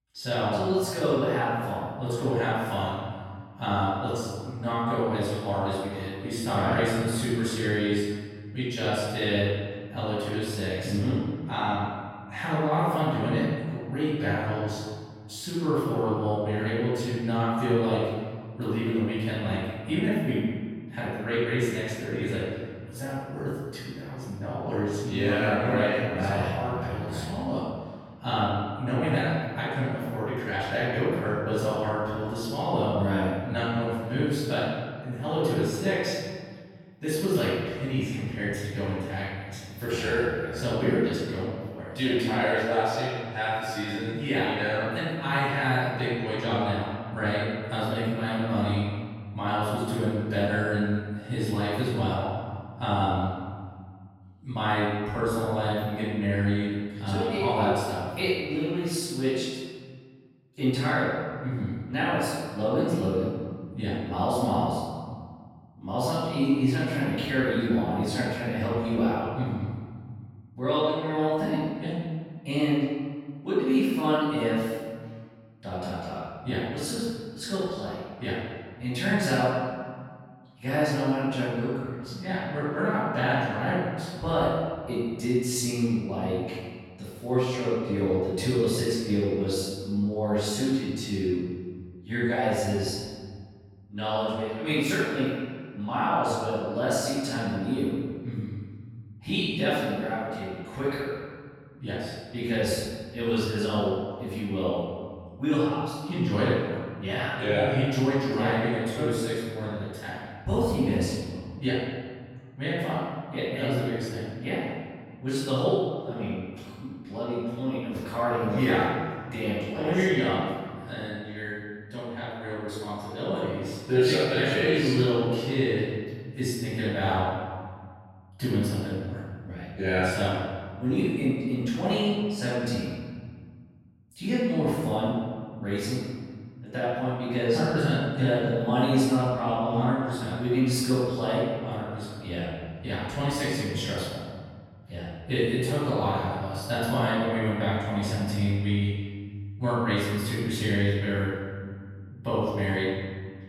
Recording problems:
room echo; strong; dies away in 1.6 s
off-mic speech; far

